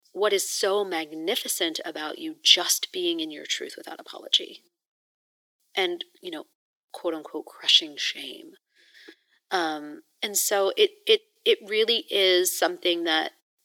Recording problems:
thin; very; fading below 300 Hz

